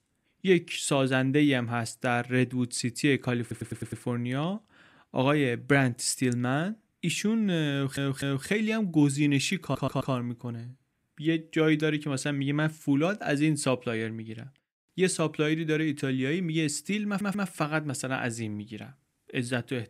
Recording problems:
audio stuttering; 4 times, first at 3.5 s

